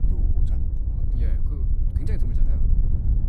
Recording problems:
wind noise on the microphone; heavy; 5 dB above the speech

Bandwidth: 15 kHz